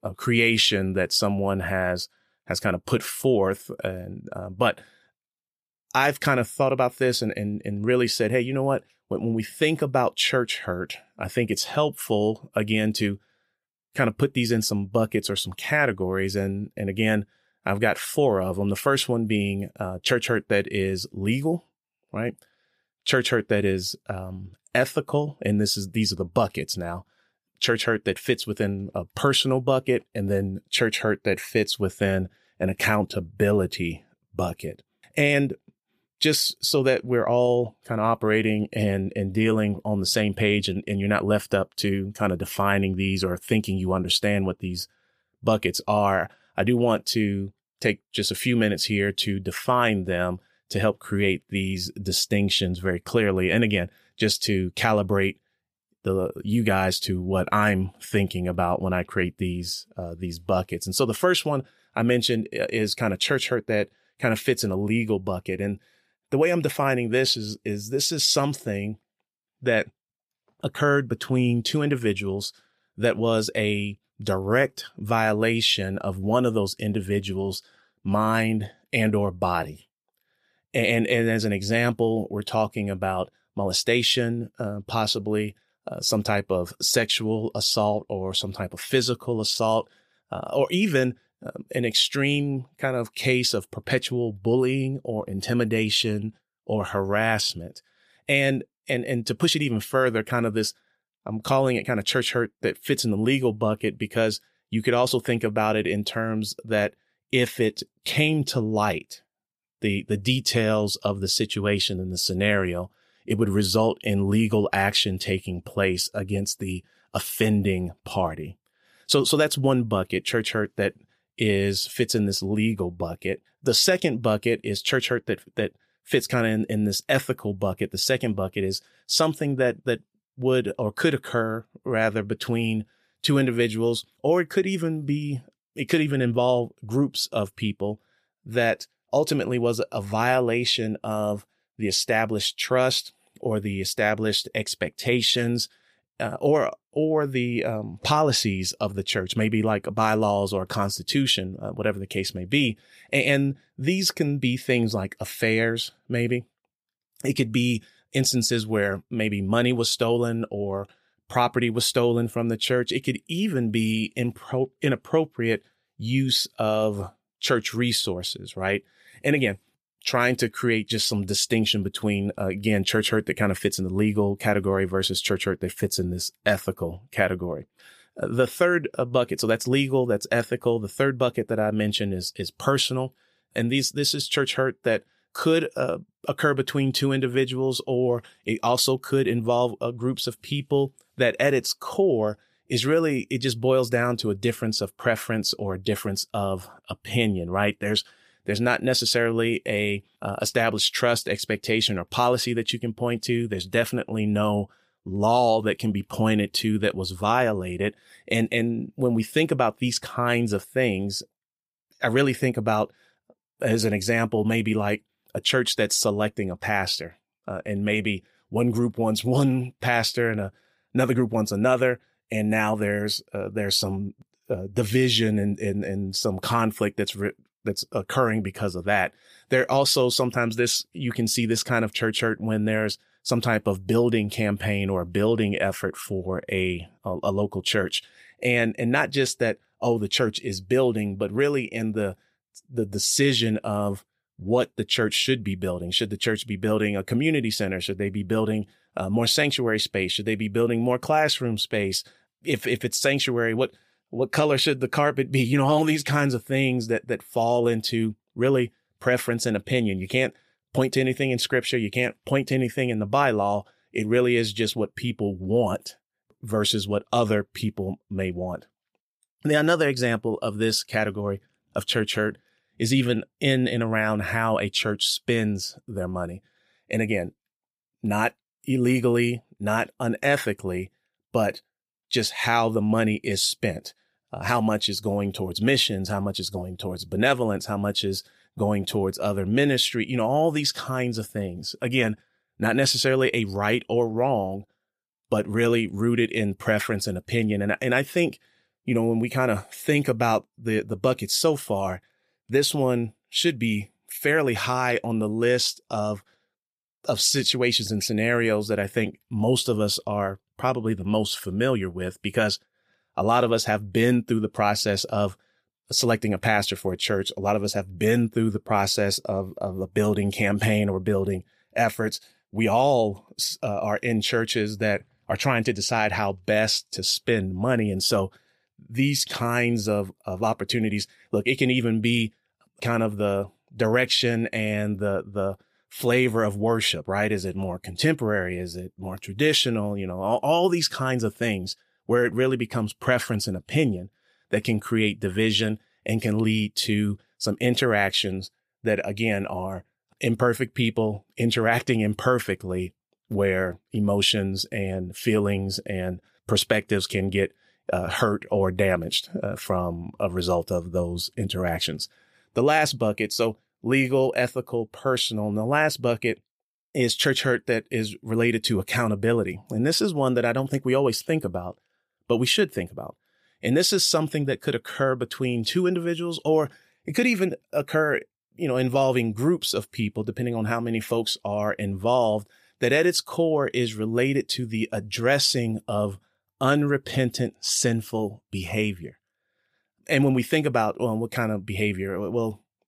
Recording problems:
none

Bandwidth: 15 kHz